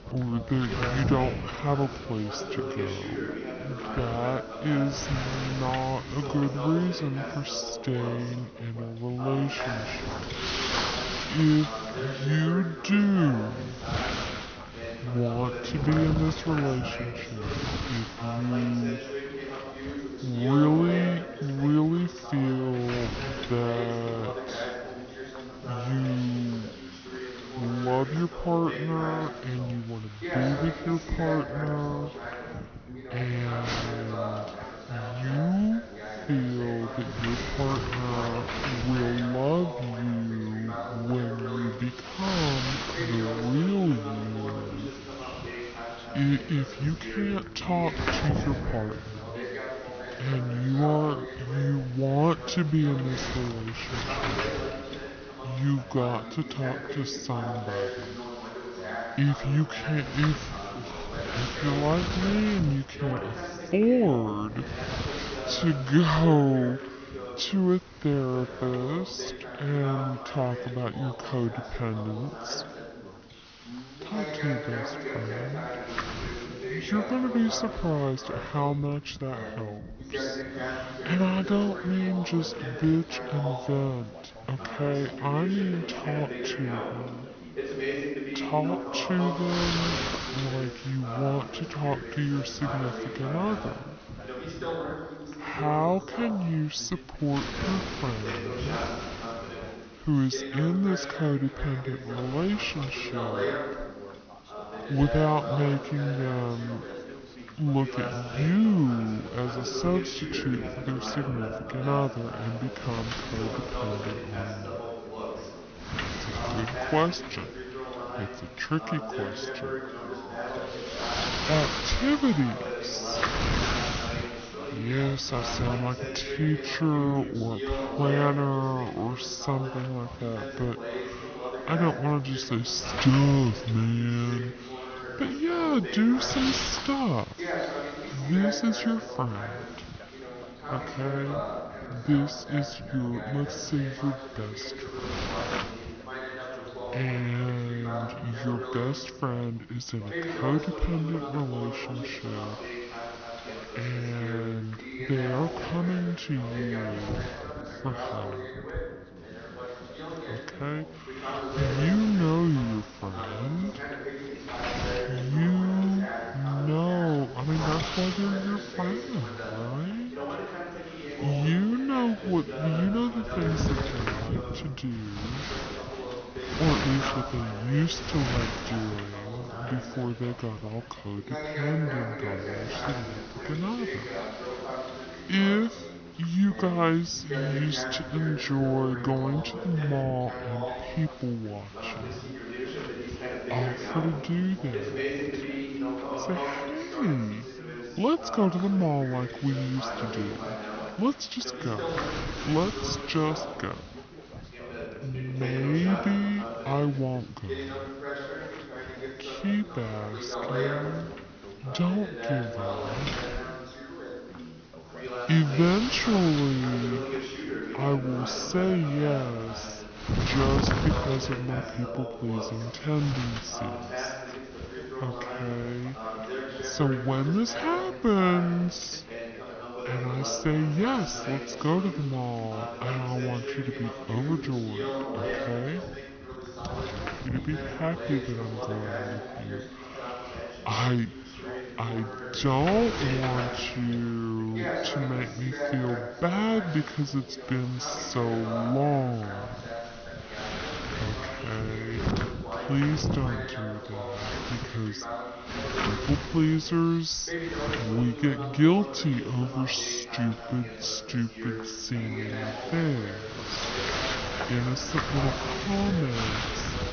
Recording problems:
wrong speed and pitch; too slow and too low; 0.7 times normal speed
high frequencies cut off; noticeable; nothing above 6 kHz
wind noise on the microphone; heavy; 5 dB below the speech
background chatter; loud; throughout; 2 voices, 8 dB below the speech
siren; faint; from 1:59 to 2:04; peak 10 dB below the speech

